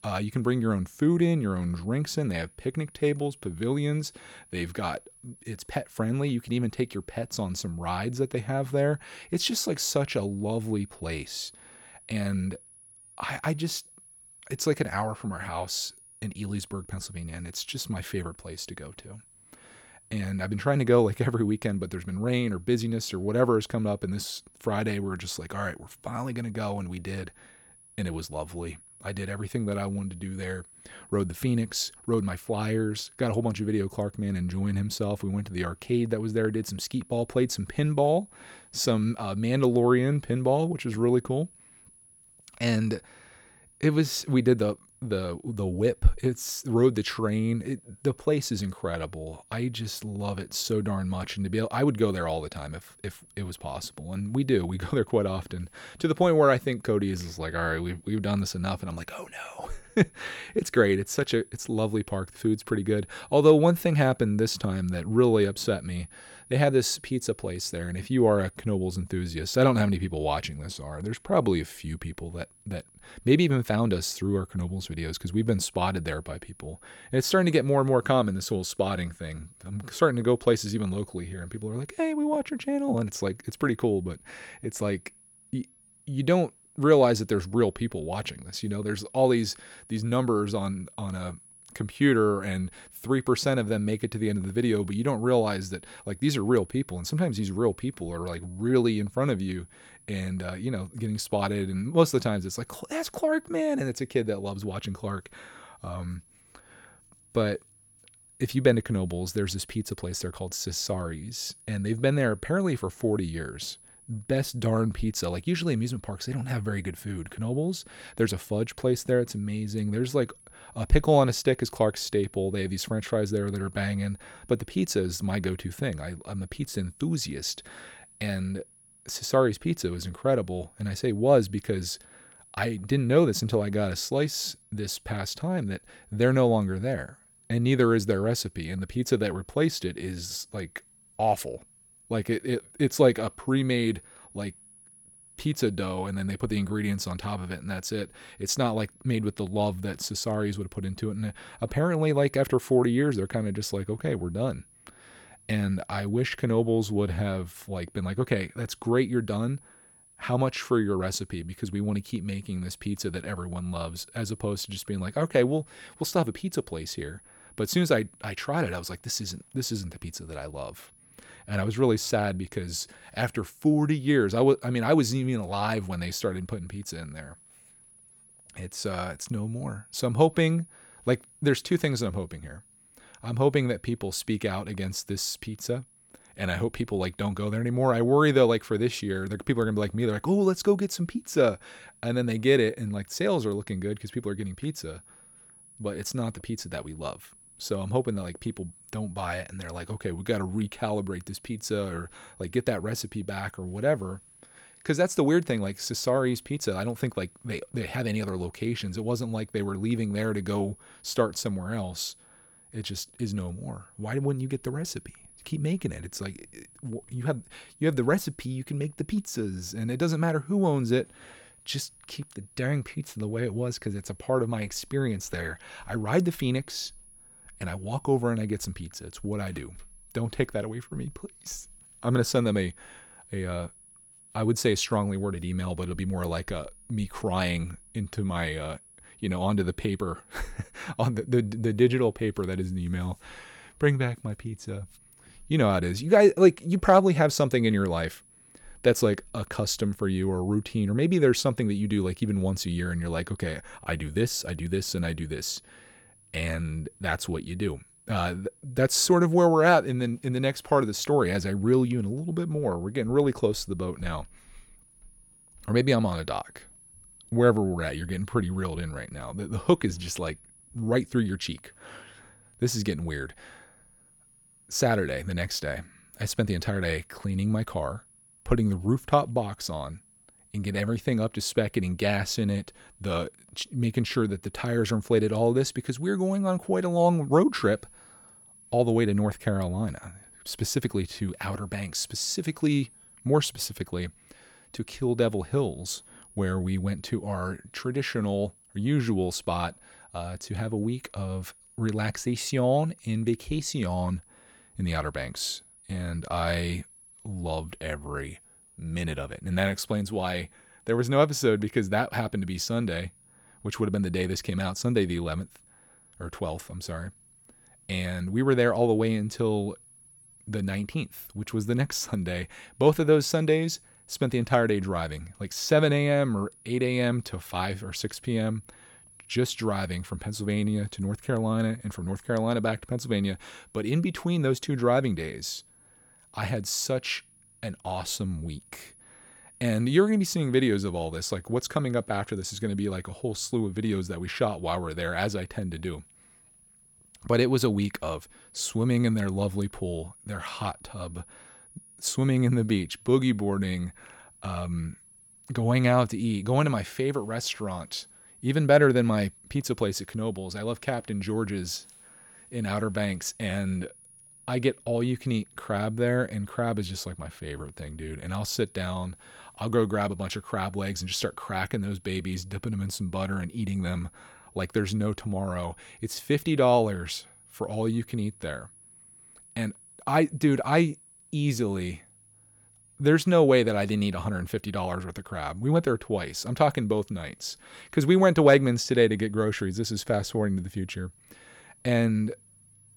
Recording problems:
high-pitched whine; faint; throughout; 10.5 kHz, 25 dB below the speech

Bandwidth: 17 kHz